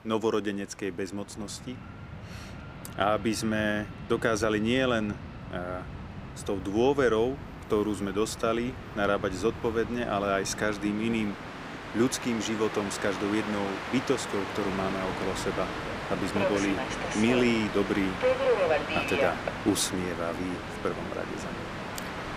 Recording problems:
train or aircraft noise; loud; throughout; 5 dB below the speech

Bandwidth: 15 kHz